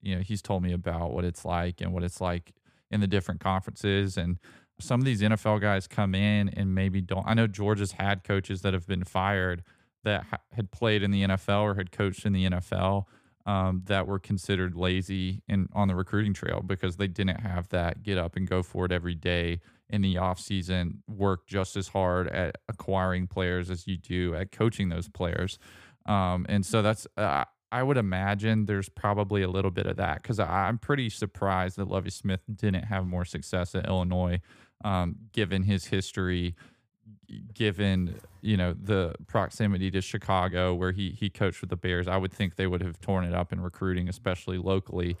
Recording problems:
none

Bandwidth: 15 kHz